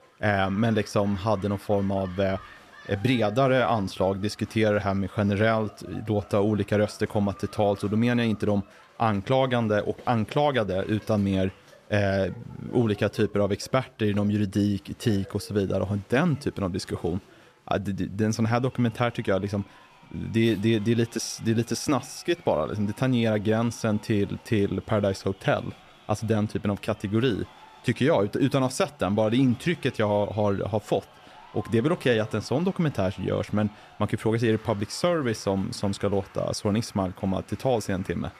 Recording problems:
crowd noise; faint; throughout; 25 dB below the speech

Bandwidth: 14.5 kHz